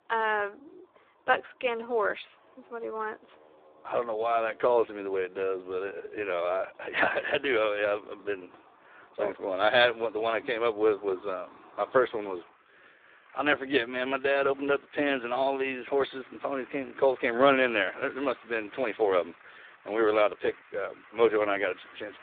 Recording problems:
phone-call audio; poor line; nothing above 3.5 kHz
traffic noise; faint; throughout; 25 dB below the speech

